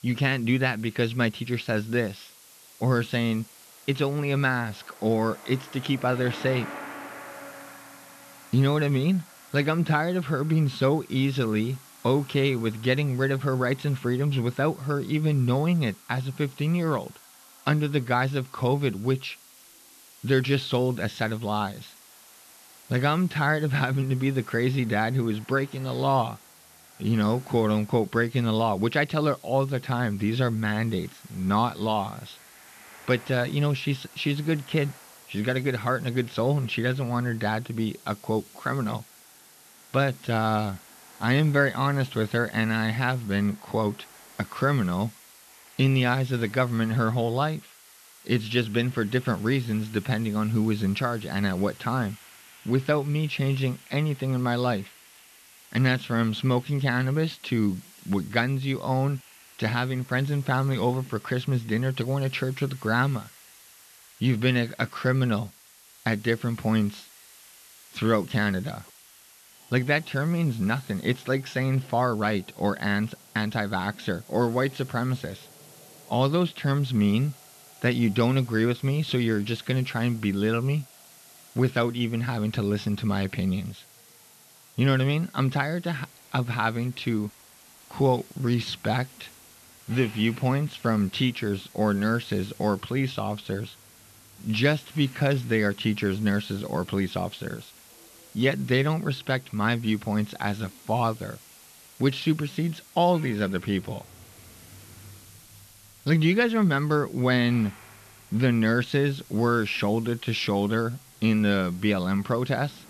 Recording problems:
muffled; very slightly; fading above 3 kHz
traffic noise; faint; throughout; 25 dB below the speech
hiss; faint; throughout; 25 dB below the speech

